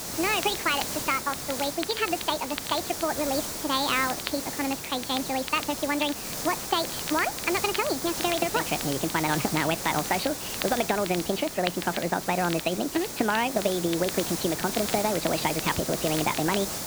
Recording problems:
high frequencies cut off; severe; nothing above 5 kHz
wrong speed and pitch; too fast and too high; 1.5 times normal speed
hiss; loud; throughout; 4 dB below the speech
crackle, like an old record; noticeable; 10 dB below the speech

